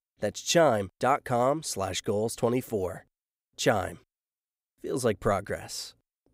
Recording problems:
none

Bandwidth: 15.5 kHz